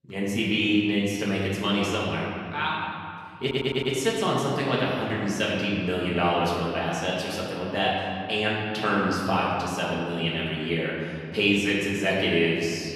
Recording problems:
off-mic speech; far
room echo; noticeable; dies away in 2.3 s
audio stuttering; at 3.5 s

